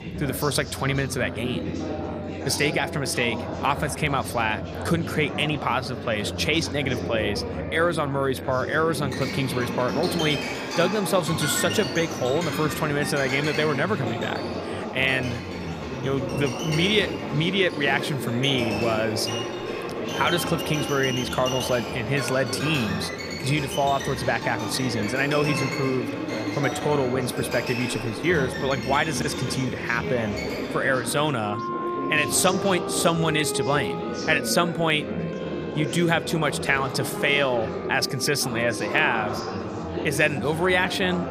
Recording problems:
background music; loud; throughout; 9 dB below the speech
chatter from many people; loud; throughout; 7 dB below the speech

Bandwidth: 15 kHz